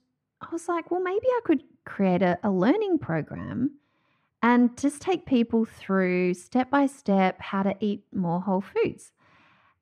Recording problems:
muffled; very; fading above 3 kHz

